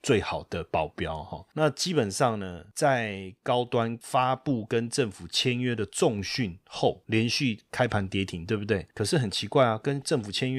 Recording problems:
abrupt cut into speech; at the end

